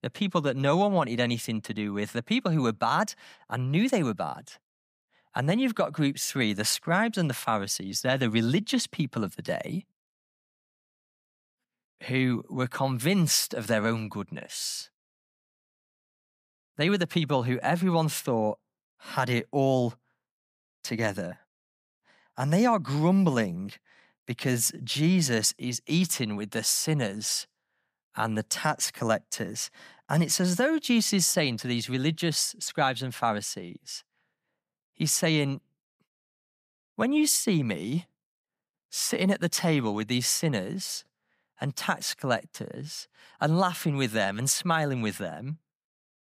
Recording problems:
none

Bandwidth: 15 kHz